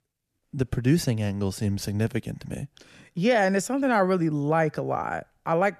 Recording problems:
none

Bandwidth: 14 kHz